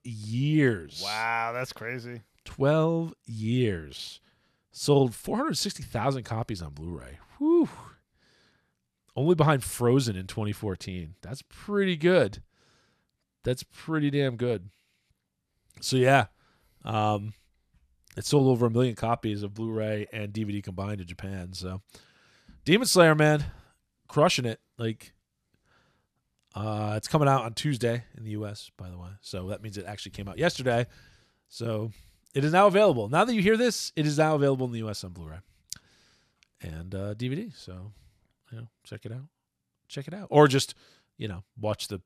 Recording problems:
none

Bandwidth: 14.5 kHz